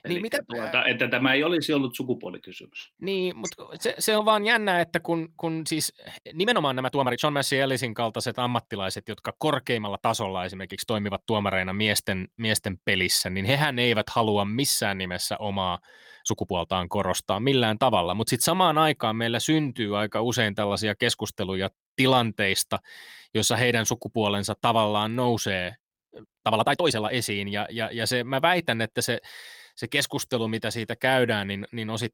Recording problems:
uneven, jittery; strongly; from 2.5 to 27 s

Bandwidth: 17 kHz